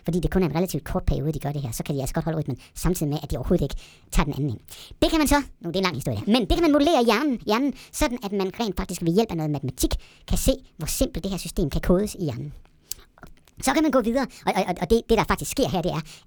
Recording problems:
wrong speed and pitch; too fast and too high; 1.5 times normal speed

